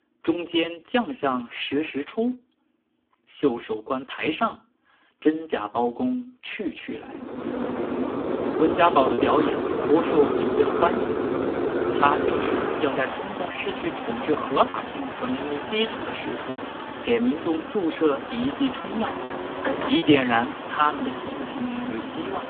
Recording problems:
phone-call audio; poor line; nothing above 3.5 kHz
traffic noise; loud; from 7.5 s on; 3 dB below the speech
choppy; occasionally; 1% of the speech affected

